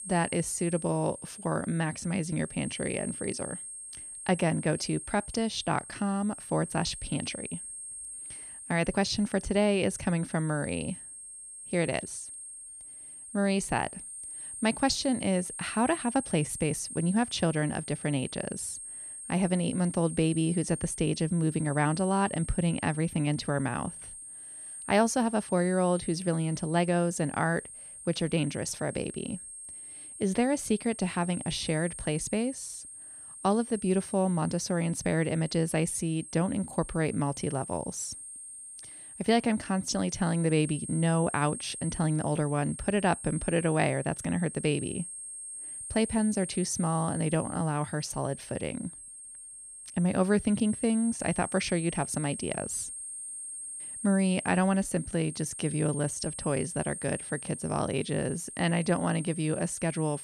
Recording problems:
high-pitched whine; noticeable; throughout; 8.5 kHz, 10 dB below the speech

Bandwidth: 14.5 kHz